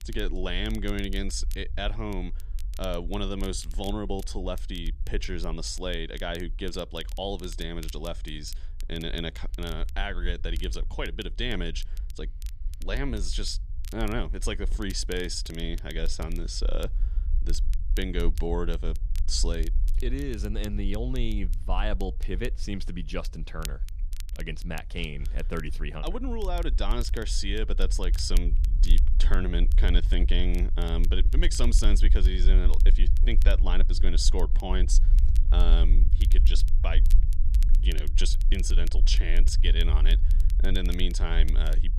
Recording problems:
low rumble; noticeable; throughout; 15 dB below the speech
crackle, like an old record; noticeable; 15 dB below the speech

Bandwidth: 14.5 kHz